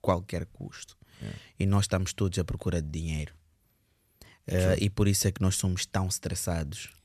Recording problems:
none

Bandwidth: 13.5 kHz